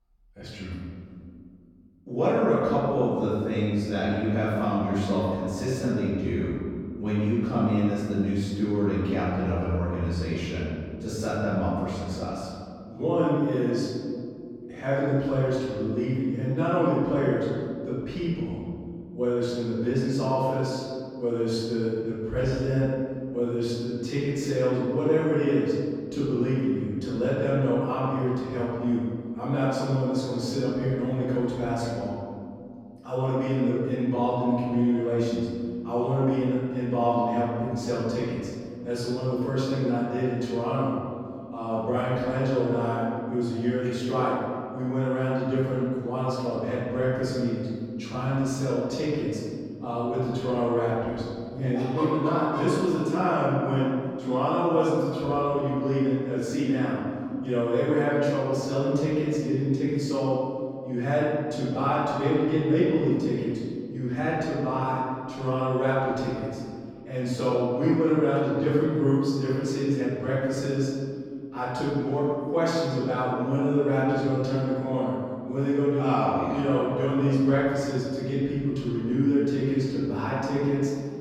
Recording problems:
room echo; strong; dies away in 2.4 s
off-mic speech; far

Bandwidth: 18 kHz